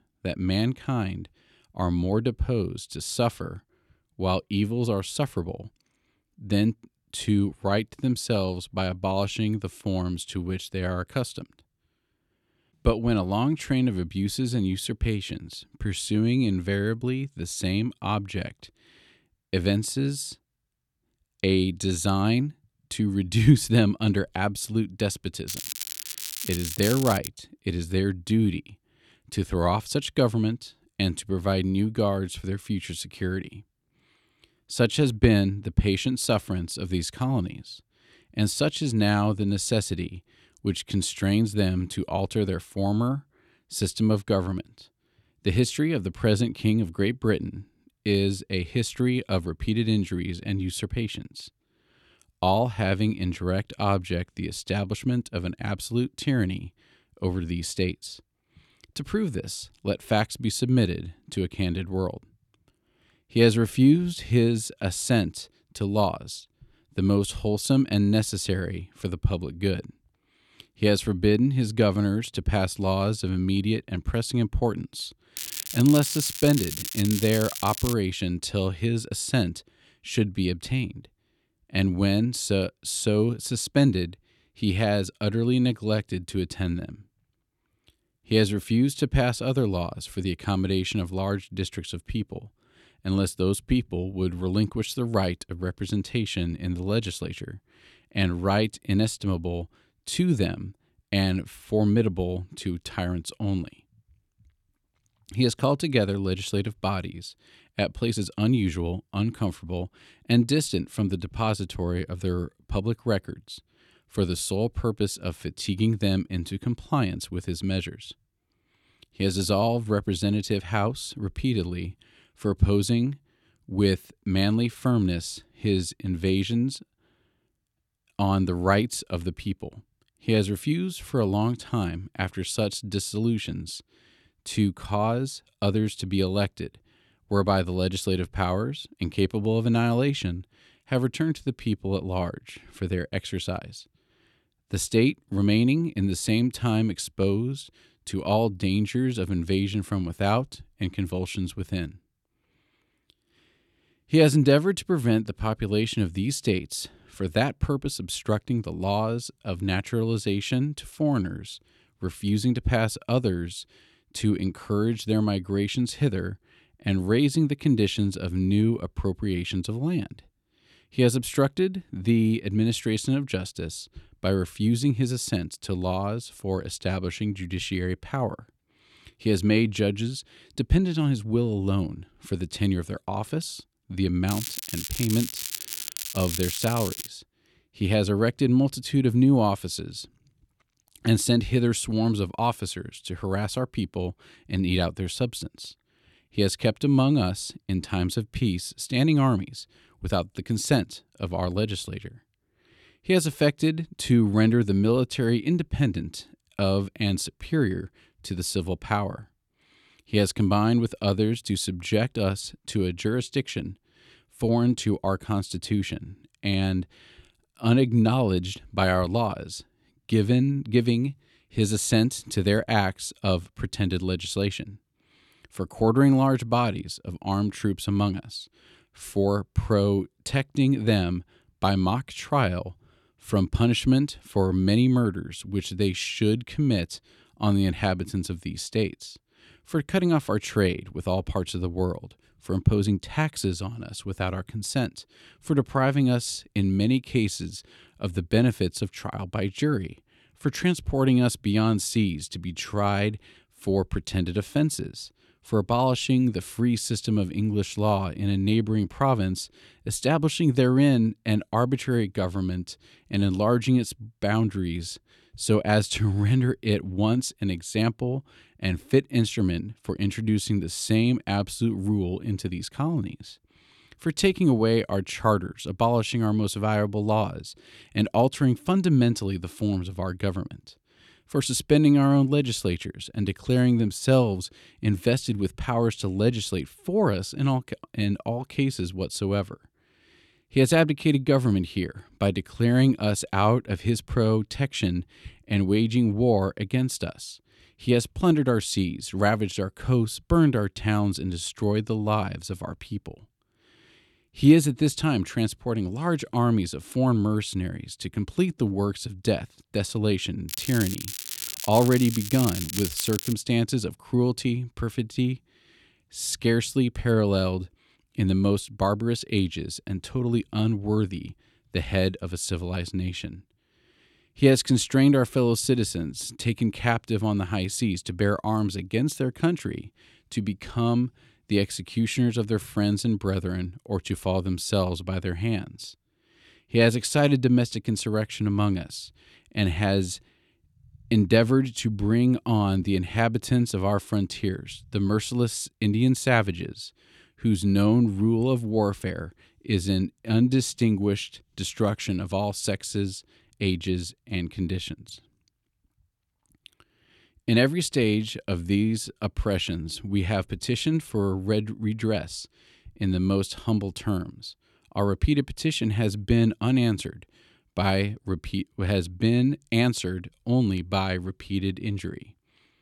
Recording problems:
crackling; loud; 4 times, first at 25 s; 7 dB below the speech

